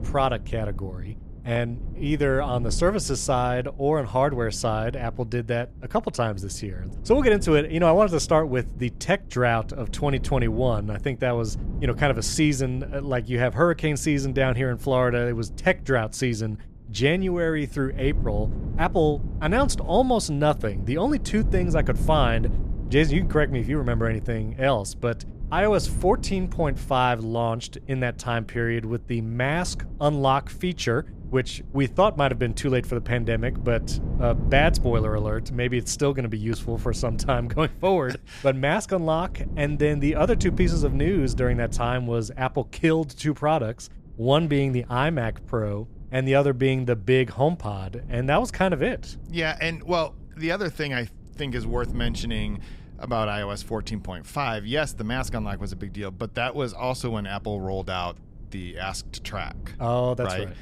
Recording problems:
wind noise on the microphone; occasional gusts; 20 dB below the speech

